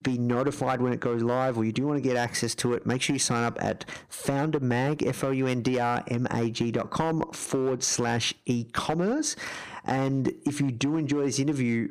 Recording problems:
distortion; slight; 5% of the sound clipped
squashed, flat; somewhat

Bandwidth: 15 kHz